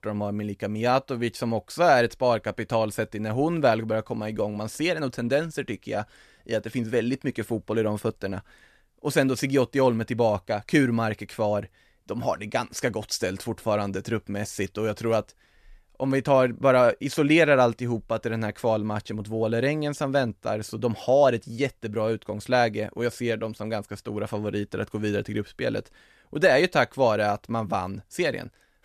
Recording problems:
none

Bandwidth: 14 kHz